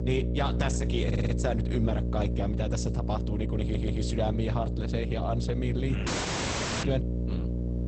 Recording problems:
garbled, watery; badly; nothing above 8 kHz
electrical hum; loud; throughout; 60 Hz, 6 dB below the speech
audio stuttering; at 1 s and at 3.5 s
audio cutting out; at 6 s for 1 s

